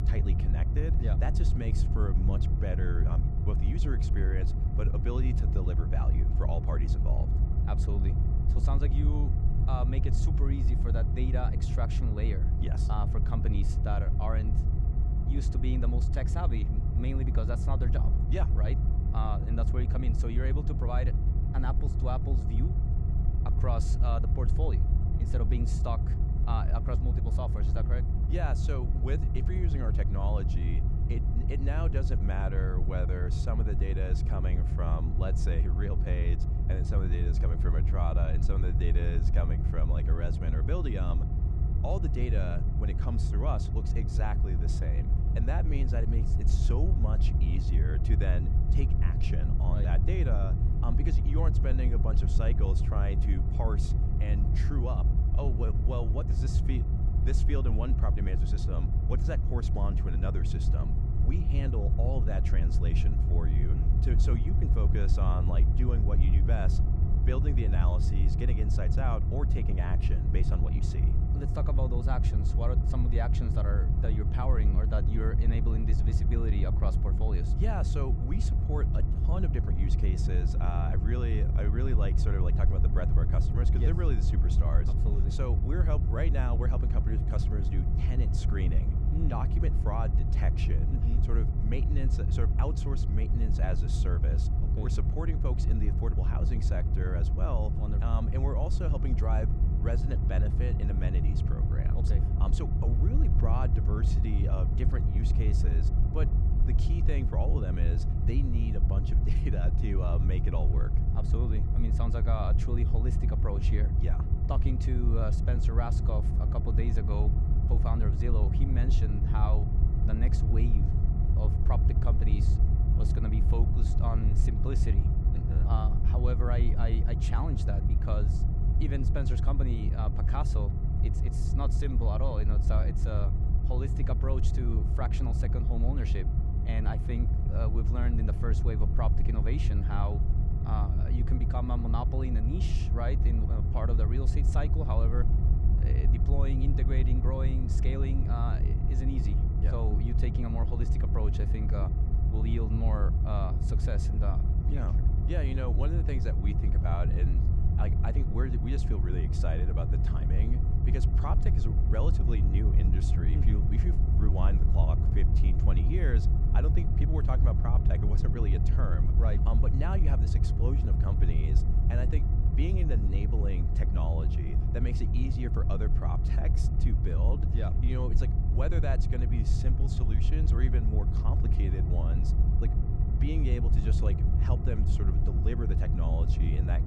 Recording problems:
low rumble; loud; throughout; 3 dB below the speech

